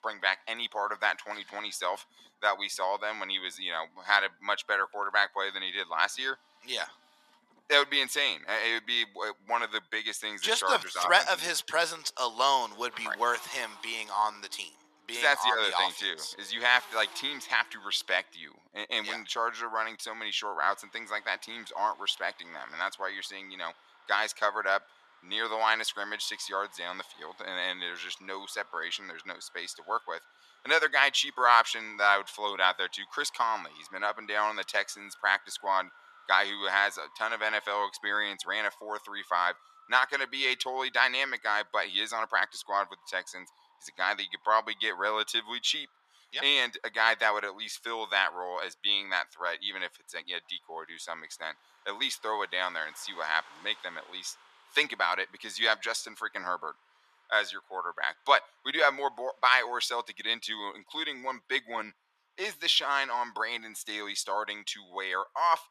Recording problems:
thin; very; fading below 950 Hz
traffic noise; faint; throughout; 25 dB below the speech

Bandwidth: 13.5 kHz